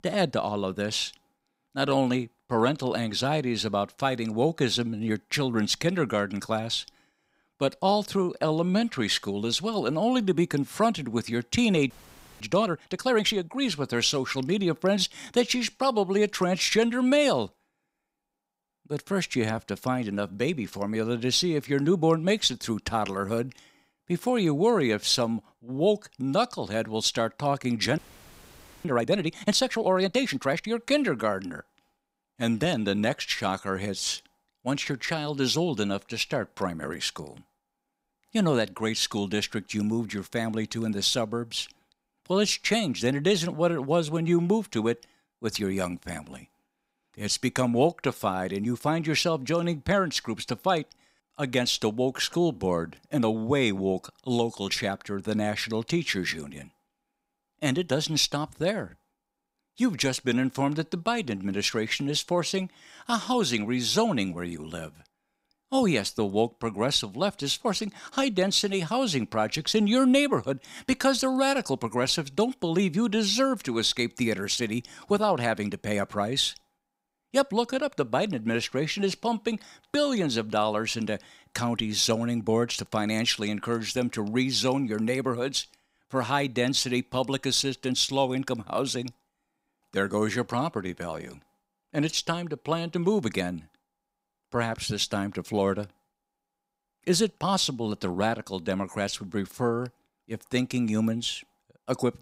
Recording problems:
audio freezing; at 12 s for 0.5 s and at 28 s for 1 s

